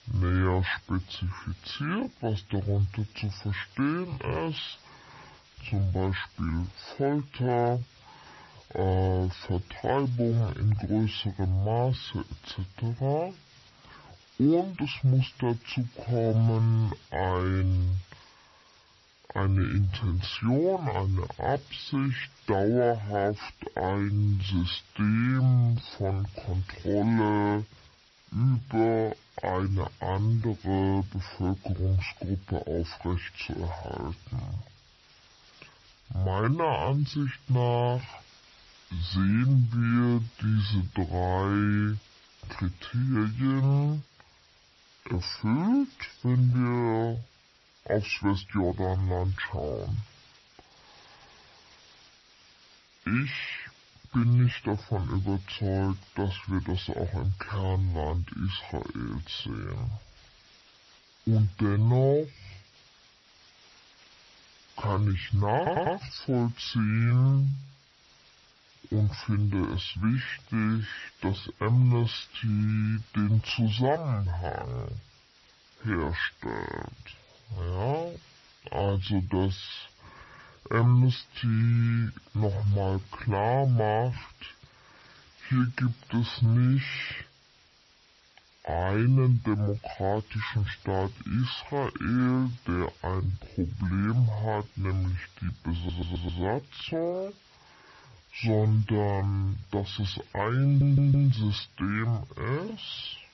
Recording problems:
wrong speed and pitch; too slow and too low; 0.6 times normal speed
garbled, watery; slightly; nothing above 5.5 kHz
hiss; faint; throughout; 25 dB below the speech
audio stuttering; at 1:06, at 1:36 and at 1:41

